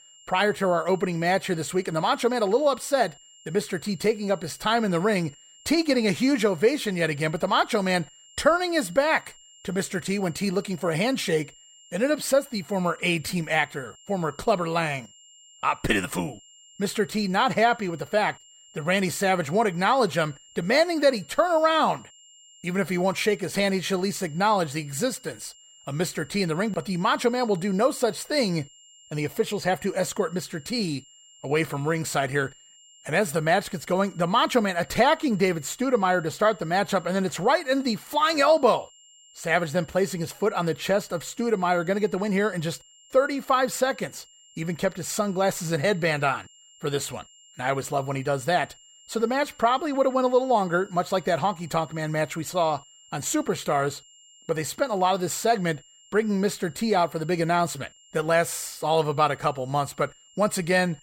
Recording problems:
high-pitched whine; faint; throughout; 3 kHz, 25 dB below the speech

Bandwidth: 16 kHz